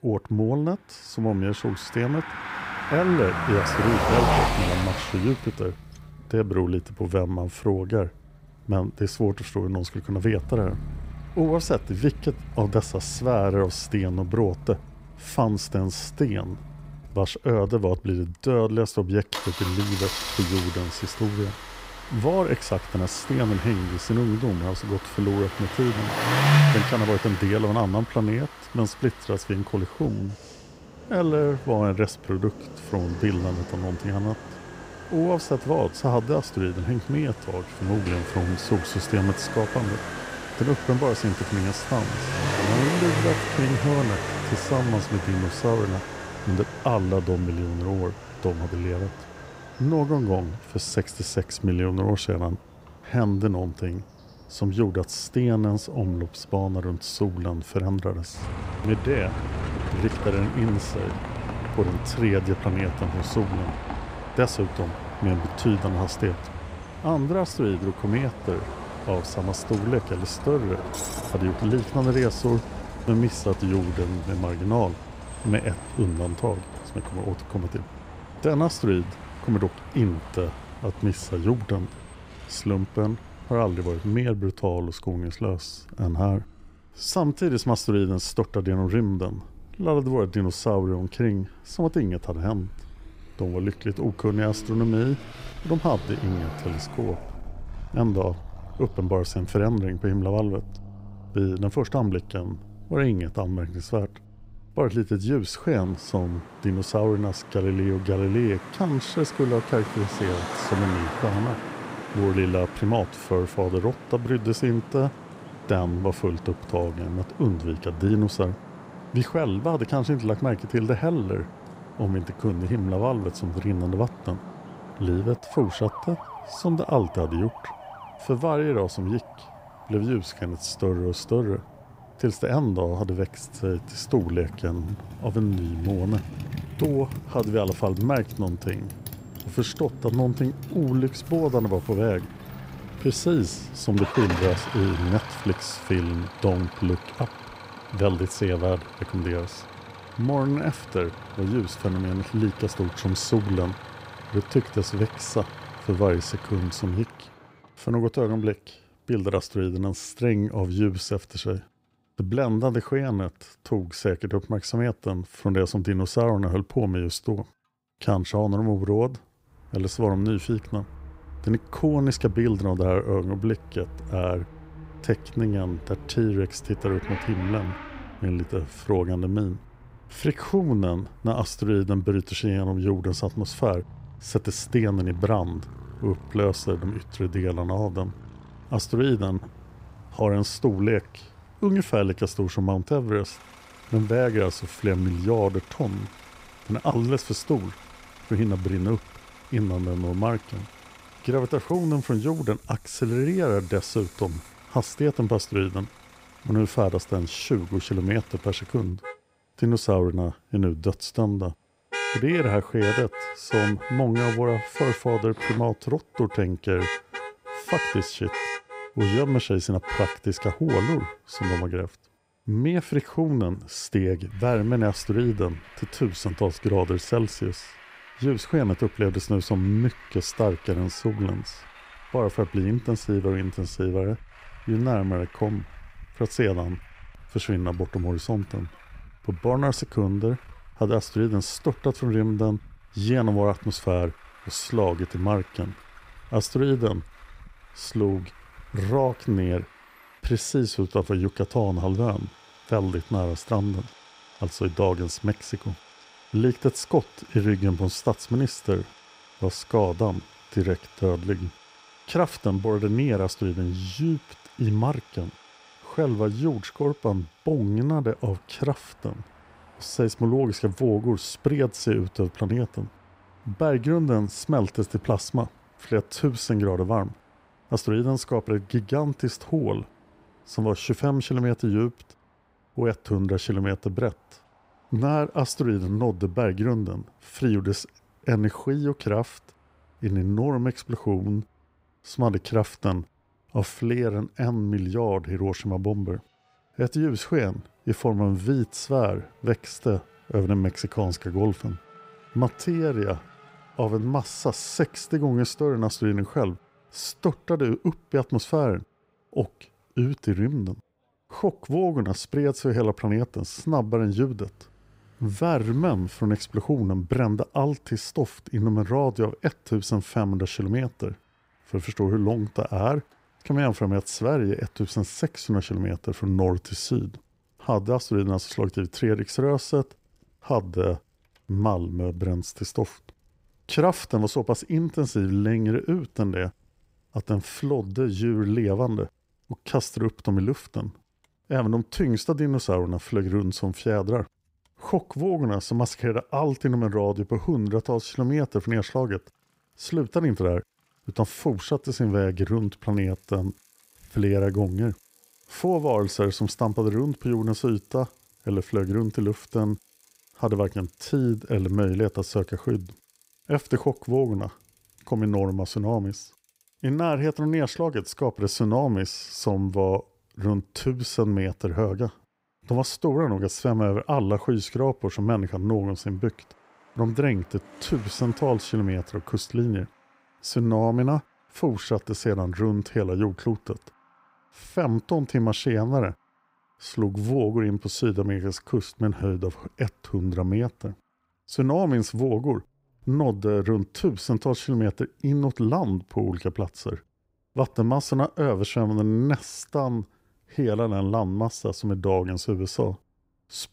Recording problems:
traffic noise; loud; throughout; 10 dB below the speech

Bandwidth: 15.5 kHz